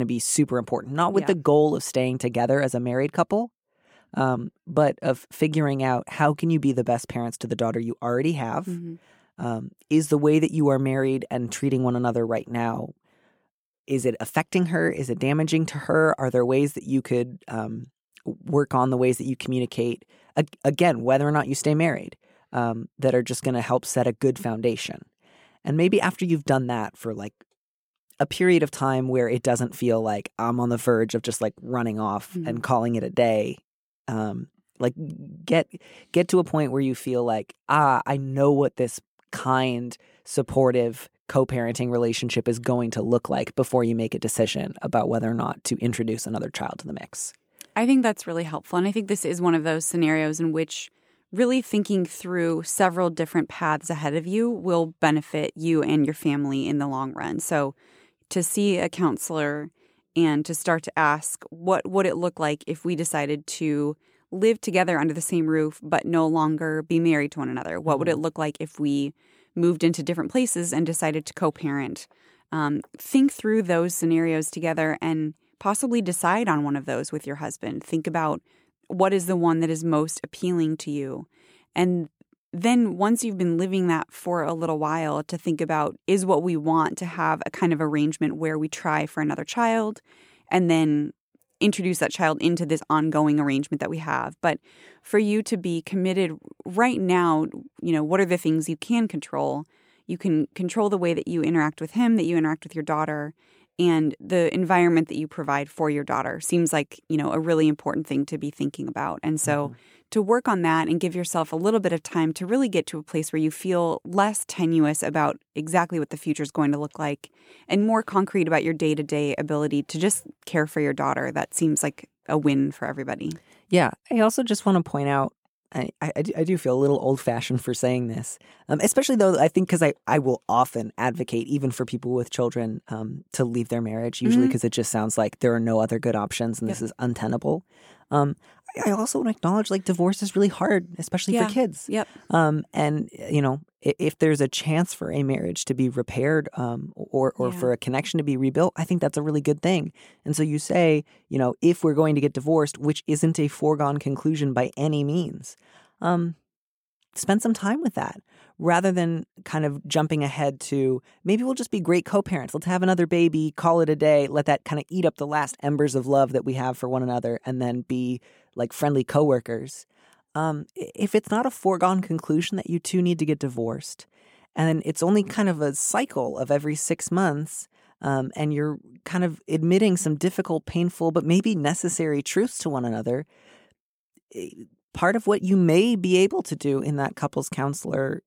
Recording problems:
abrupt cut into speech; at the start

